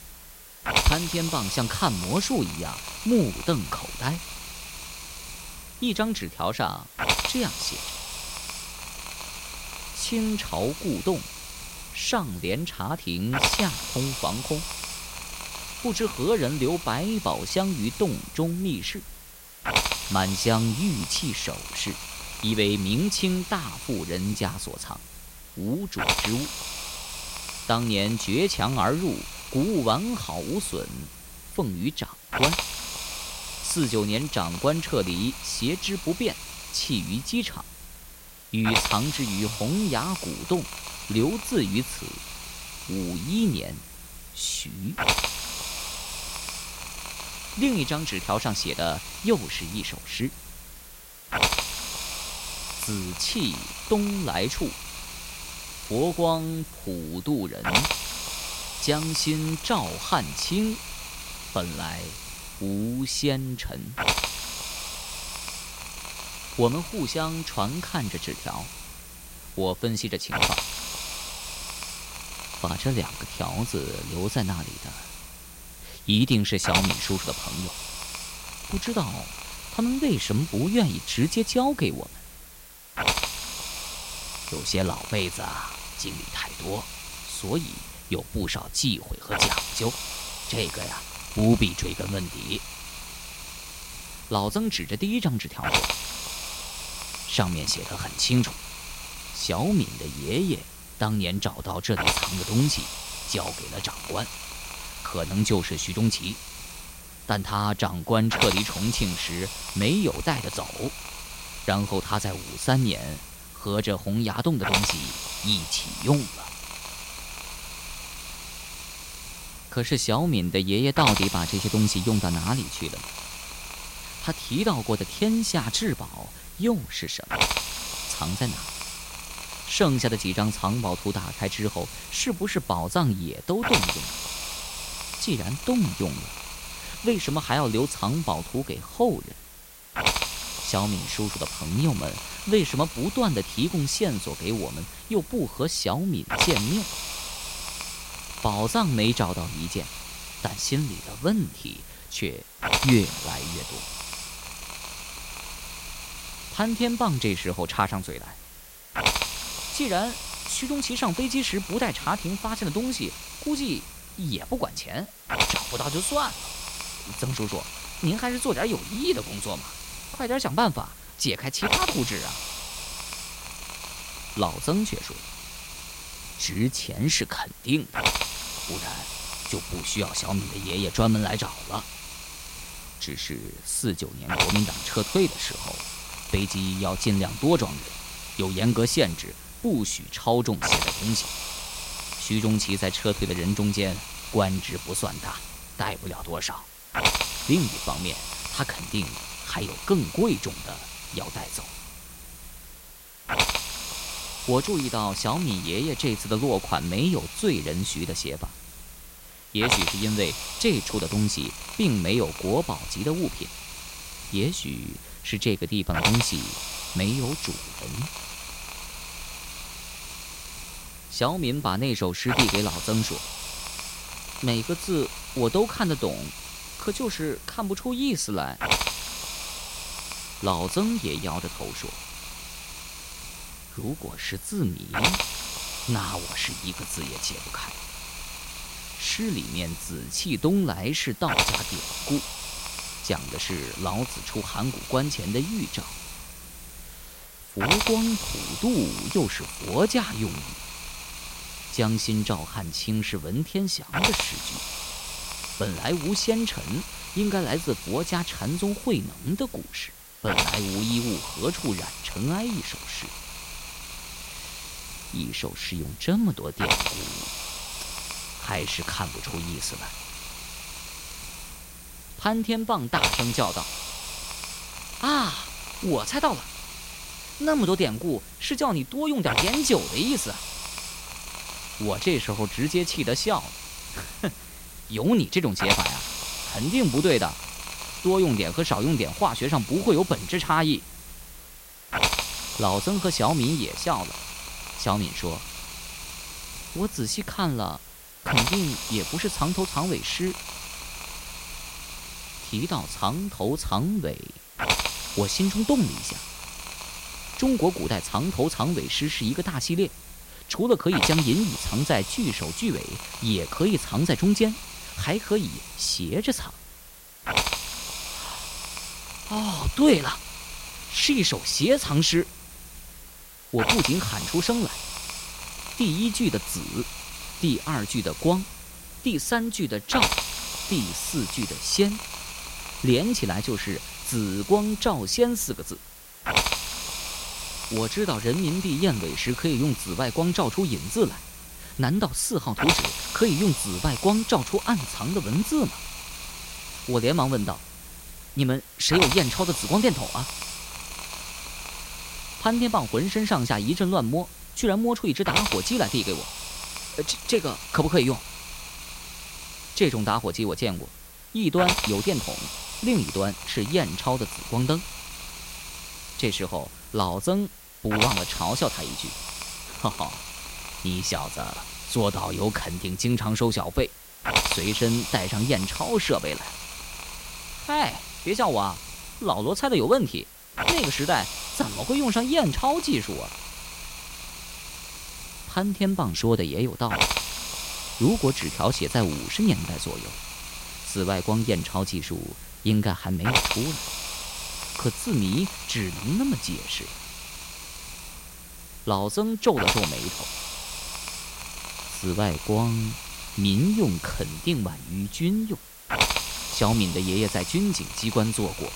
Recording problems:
hiss; loud; throughout; 5 dB below the speech

